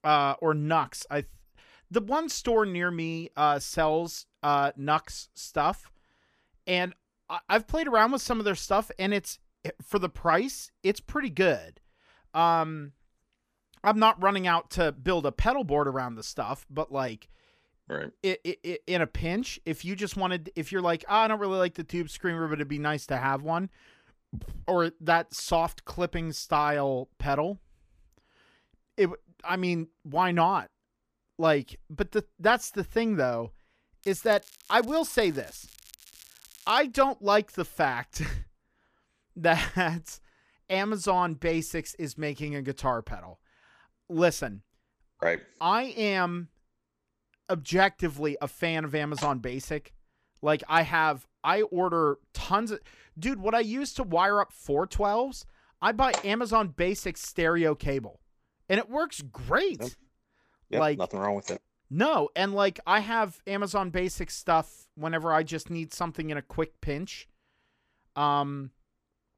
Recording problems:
crackling; faint; from 34 to 37 s; 25 dB below the speech

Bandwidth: 14.5 kHz